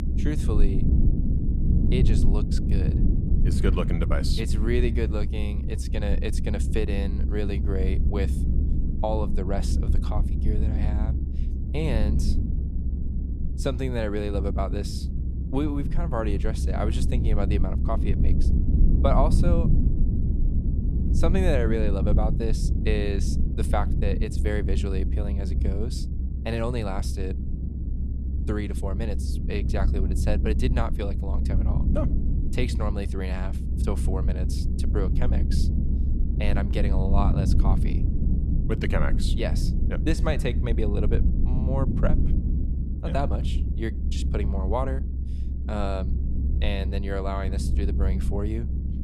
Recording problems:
low rumble; loud; throughout; 6 dB below the speech

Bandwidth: 13.5 kHz